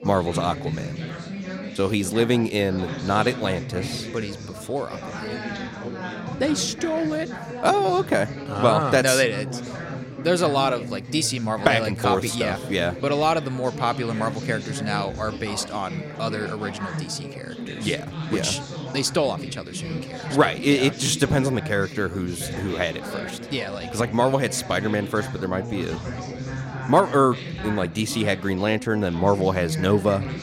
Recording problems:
background chatter; loud; throughout; 4 voices, 9 dB below the speech

